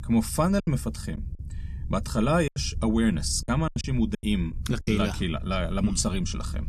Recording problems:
low rumble; faint; throughout; 25 dB below the speech
choppy; very; from 0.5 to 2.5 s and from 3.5 to 5 s; 13% of the speech affected

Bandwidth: 14 kHz